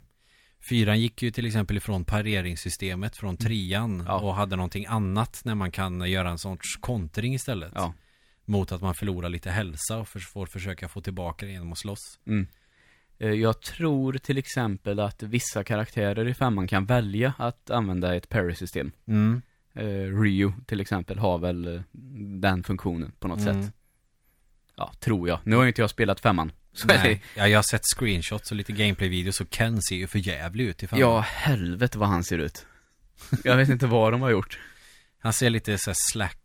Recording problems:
none

